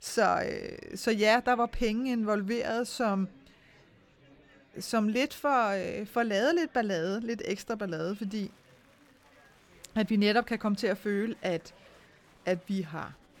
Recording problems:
murmuring crowd; faint; throughout; 30 dB below the speech

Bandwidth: 18 kHz